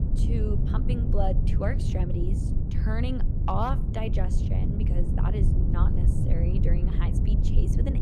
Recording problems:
low rumble; loud; throughout; 3 dB below the speech

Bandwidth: 14.5 kHz